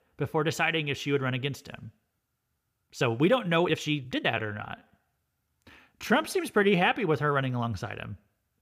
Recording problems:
uneven, jittery; strongly; from 1.5 to 7 s

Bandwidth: 15 kHz